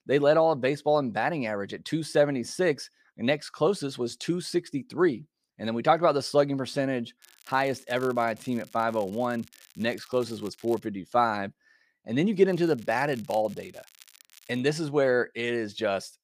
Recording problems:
crackling; faint; from 7 to 11 s and from 13 to 15 s; 25 dB below the speech

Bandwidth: 15 kHz